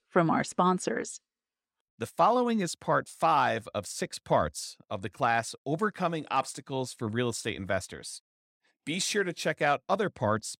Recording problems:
none

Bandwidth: 16 kHz